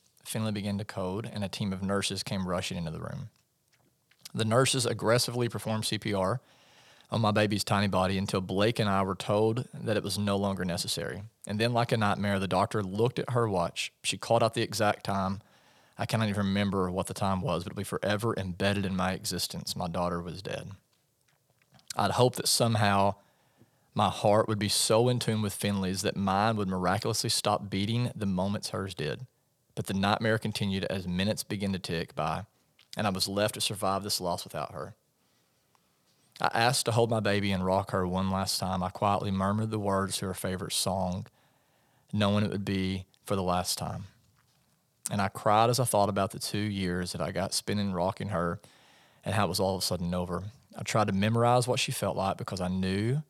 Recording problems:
none

